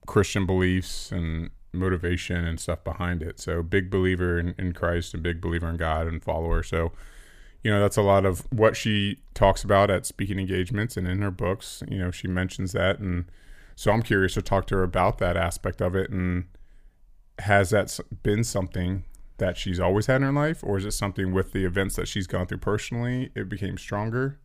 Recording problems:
none

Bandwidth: 15 kHz